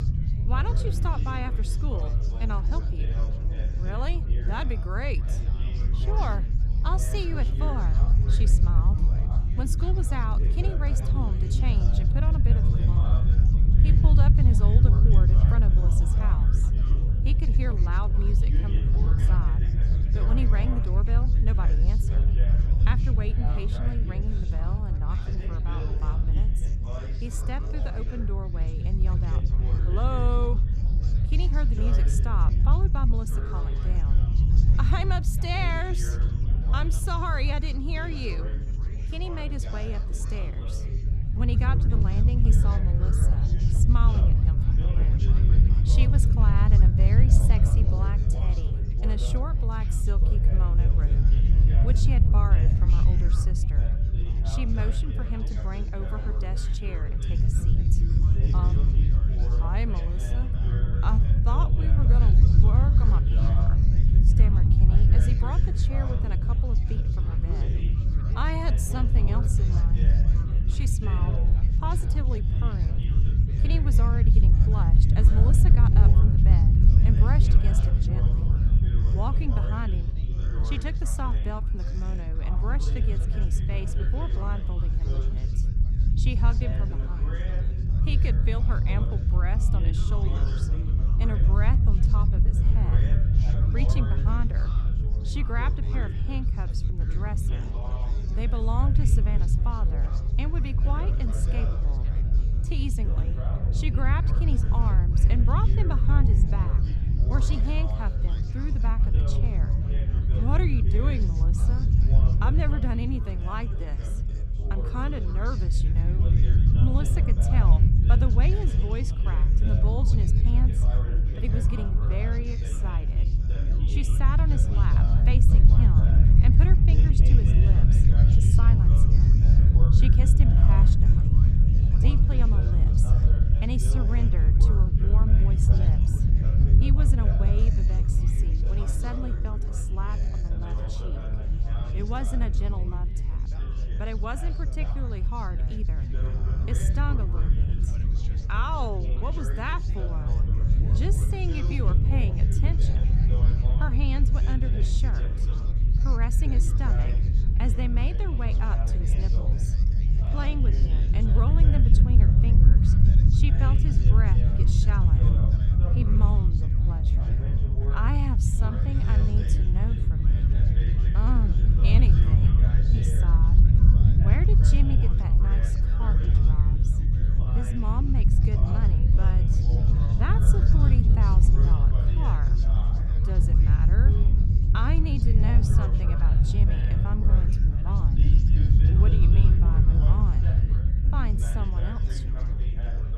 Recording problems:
chatter from many people; loud; throughout; 7 dB below the speech
low rumble; loud; throughout; 2 dB below the speech

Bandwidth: 14 kHz